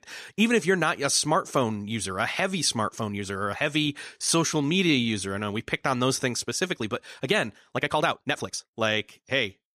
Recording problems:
uneven, jittery; strongly; from 3 to 9 s

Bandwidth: 14.5 kHz